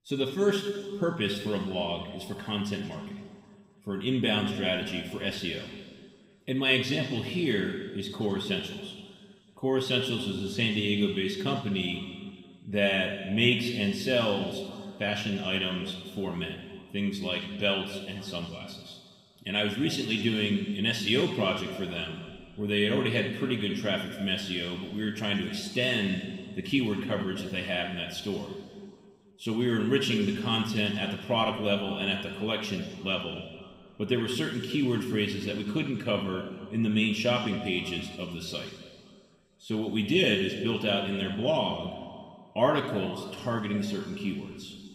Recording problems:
room echo; noticeable; dies away in 1.9 s
off-mic speech; somewhat distant

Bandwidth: 15.5 kHz